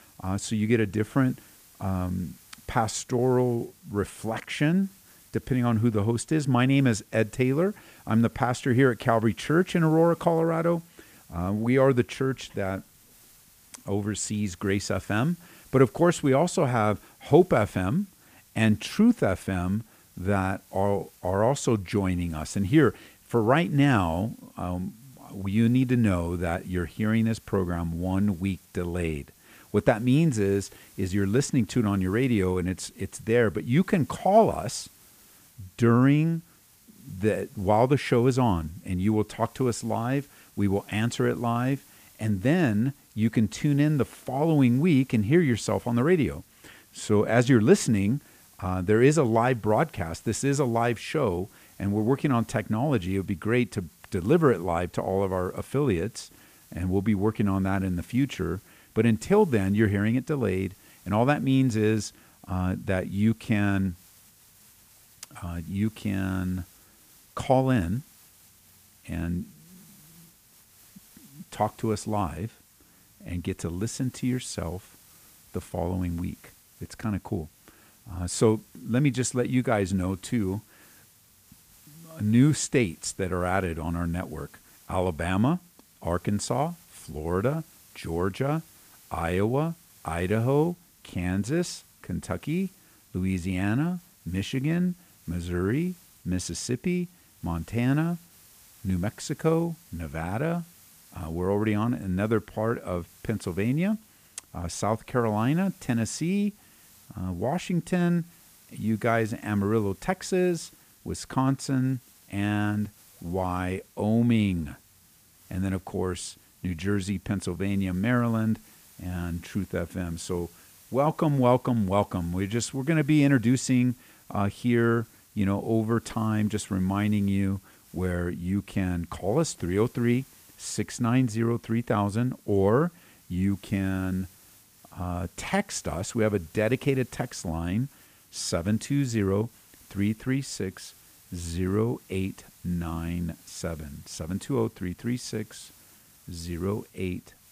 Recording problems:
hiss; faint; throughout; 25 dB below the speech

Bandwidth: 15 kHz